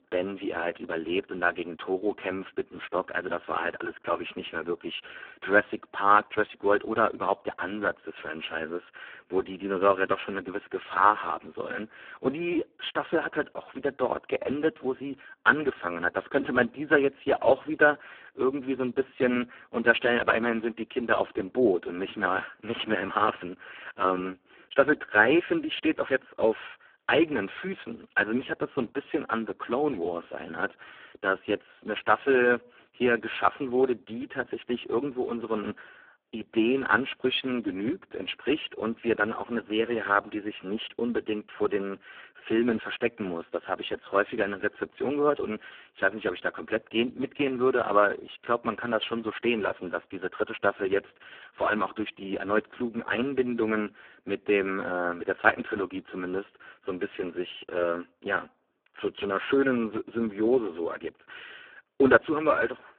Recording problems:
phone-call audio; poor line

